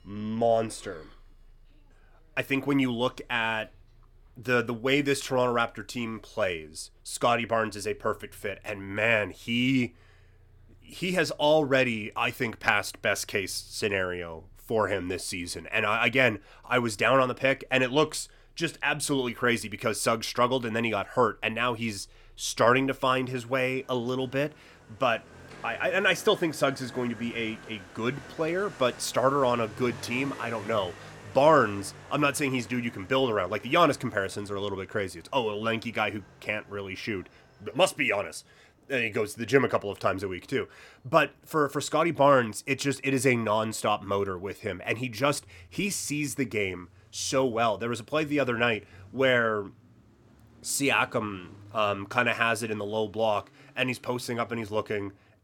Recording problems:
traffic noise; faint; throughout; 25 dB below the speech

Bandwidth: 17 kHz